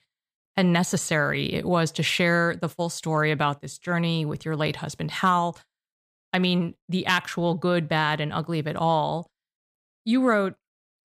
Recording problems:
none

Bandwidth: 15 kHz